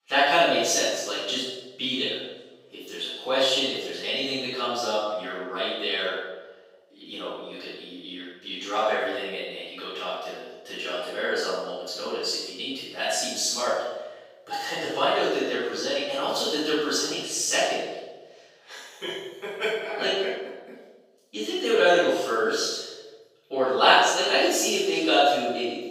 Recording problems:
room echo; strong; dies away in 0.9 s
off-mic speech; far
thin; somewhat; fading below 350 Hz

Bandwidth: 15.5 kHz